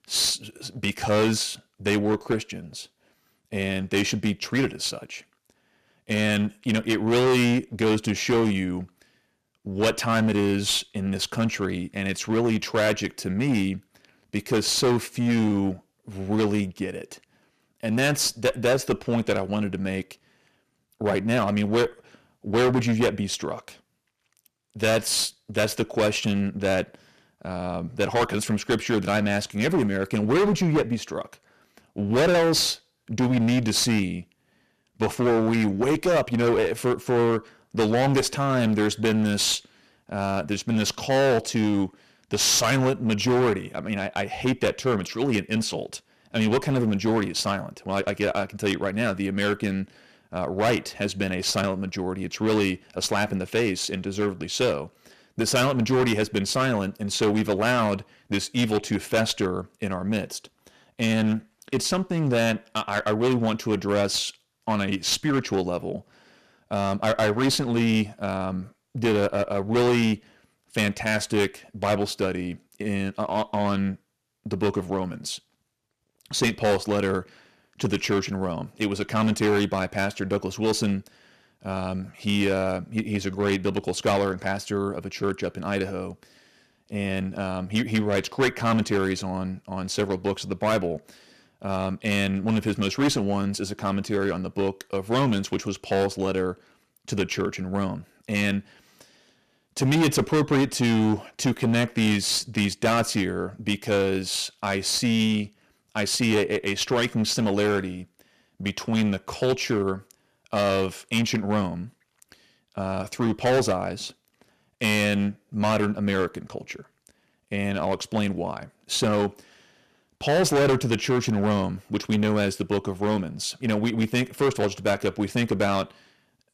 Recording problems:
distortion; heavy; 10% of the sound clipped

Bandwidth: 14.5 kHz